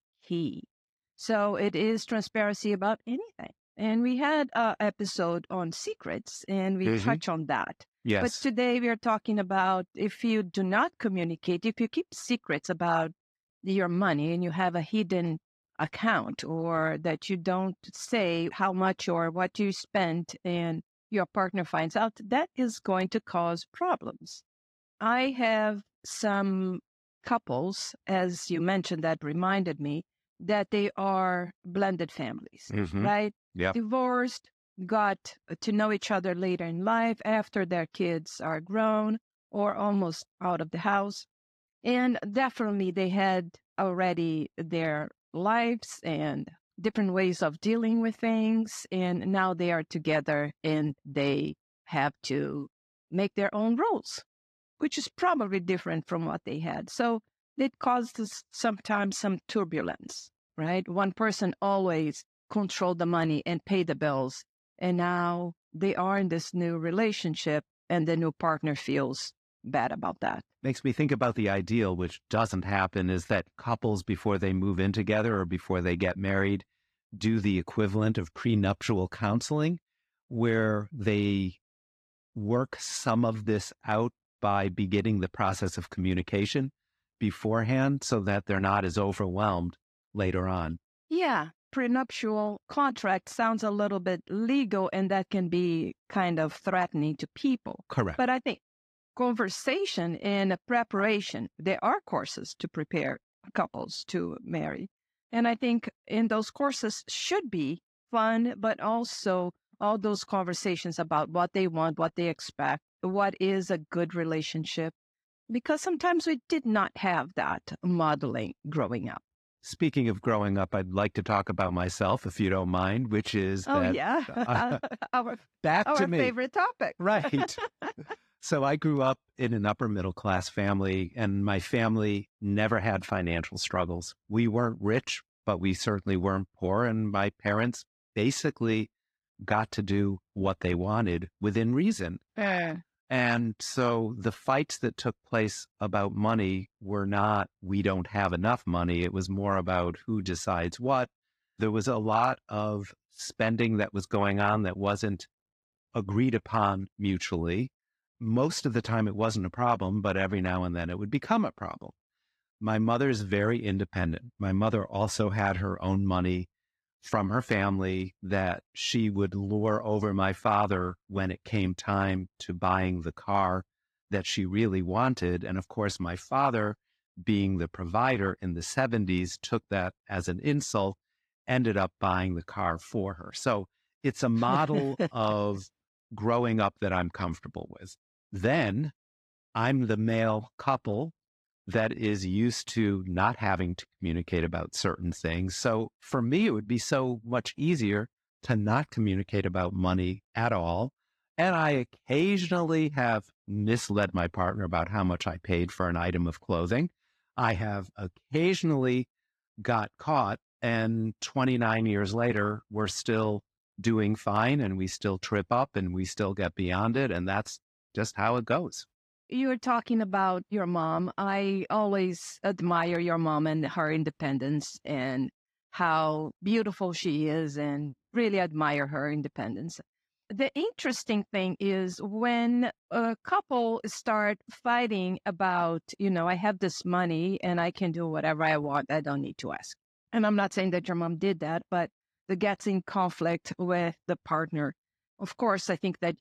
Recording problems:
garbled, watery; slightly; nothing above 14.5 kHz

